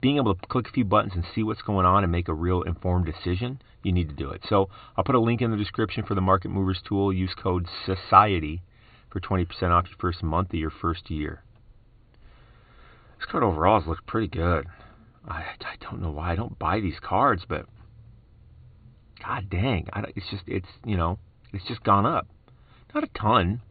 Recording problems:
high frequencies cut off; severe; nothing above 4.5 kHz

